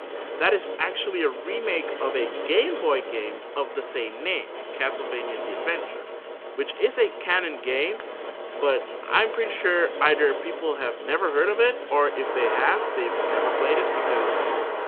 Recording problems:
phone-call audio
traffic noise; loud; throughout; 5 dB below the speech

